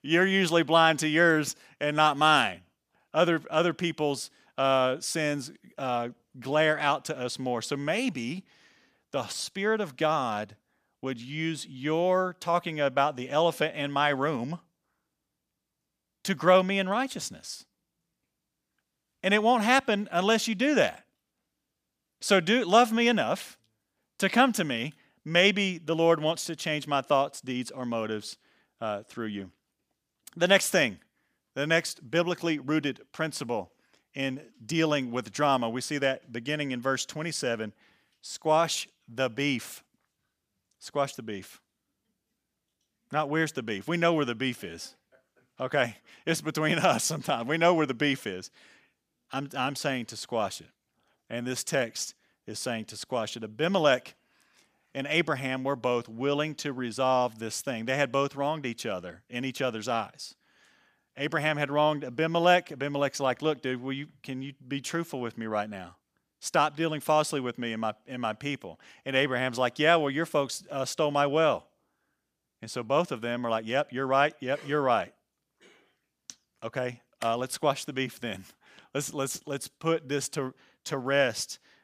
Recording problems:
none

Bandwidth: 15 kHz